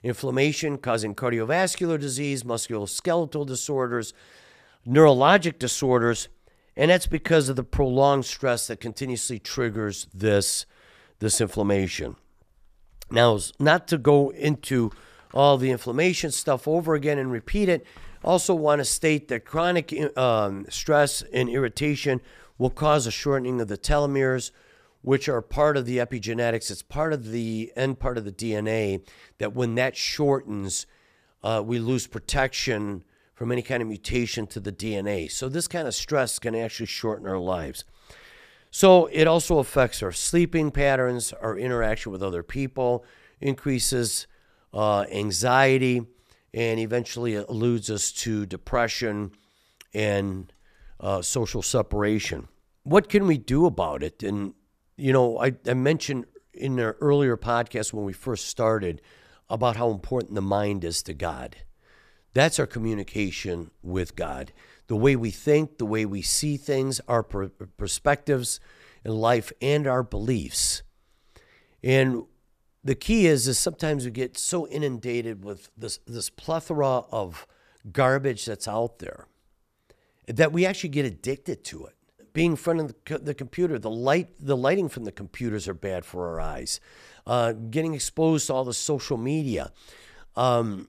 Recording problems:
none

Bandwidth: 14.5 kHz